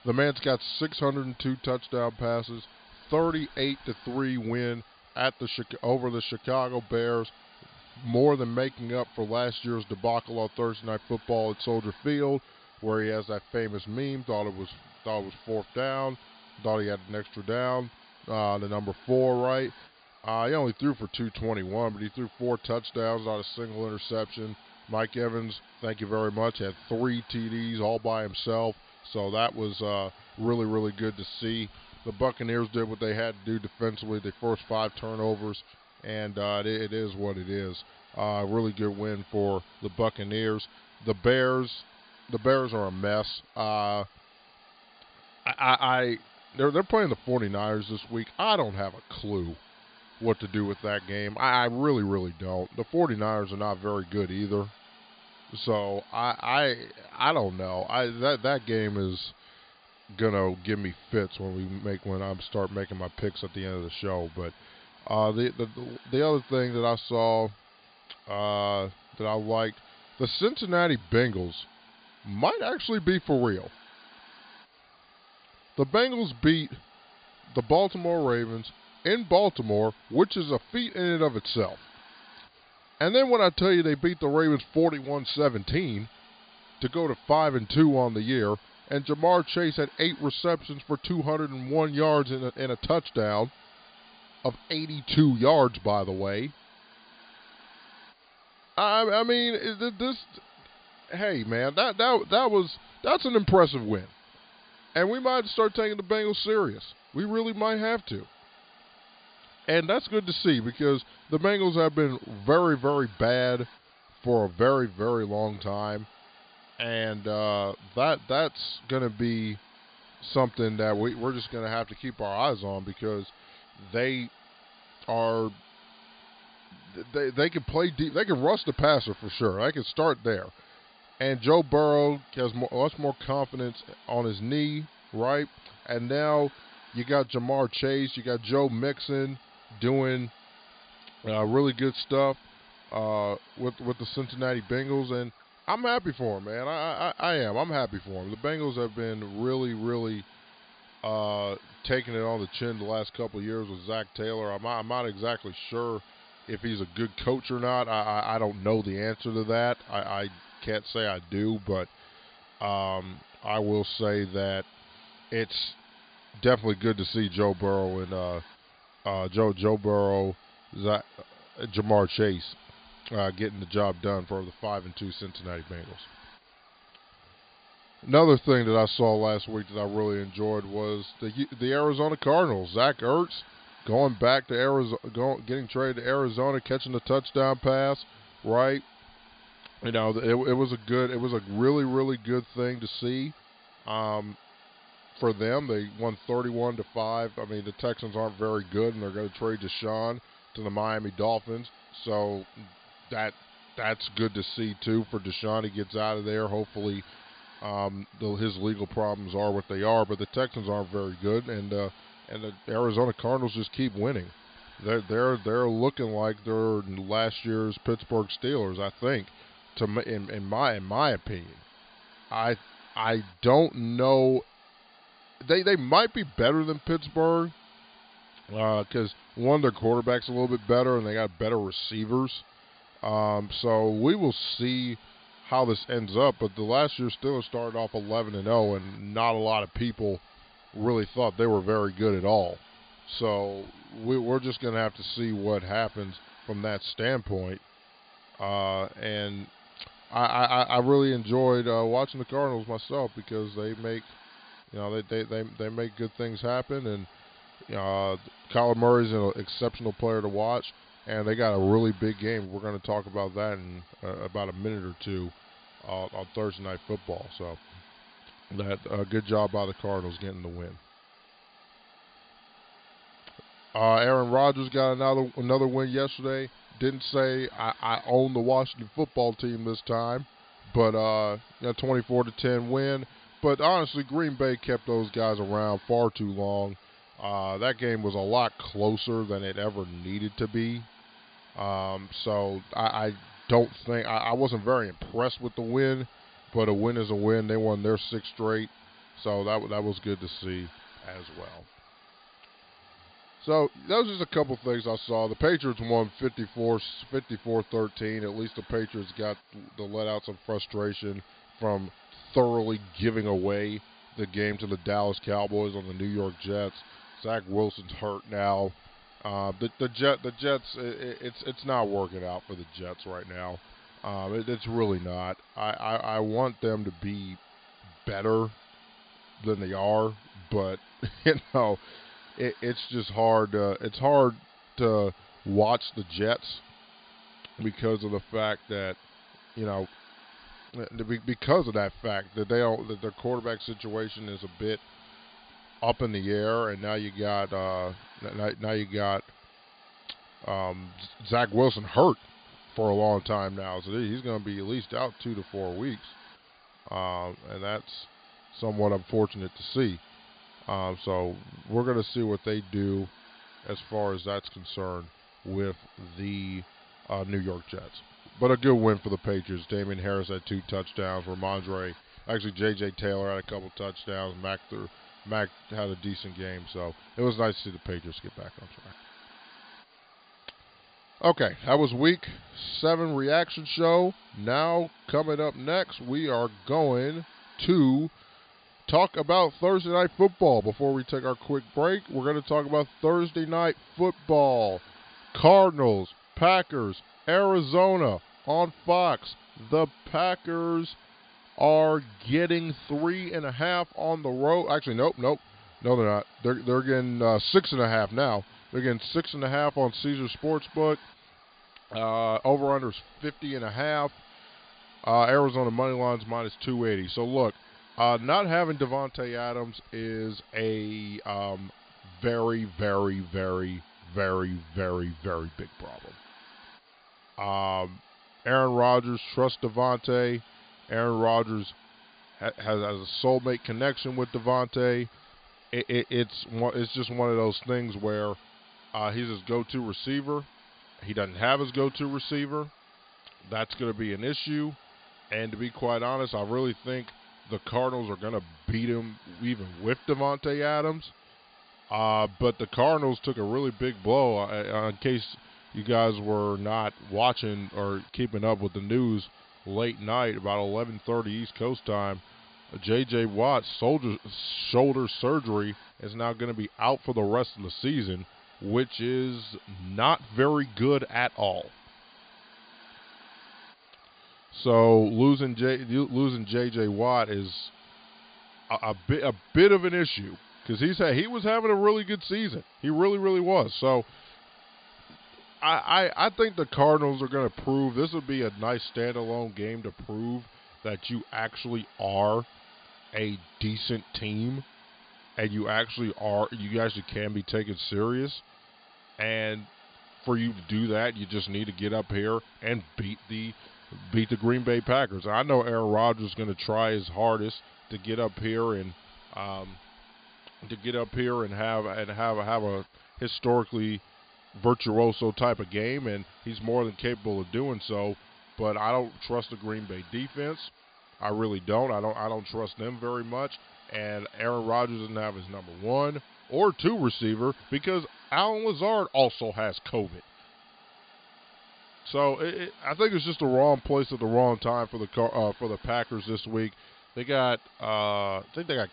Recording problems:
high frequencies cut off; severe; nothing above 5 kHz
hiss; faint; throughout; 25 dB below the speech

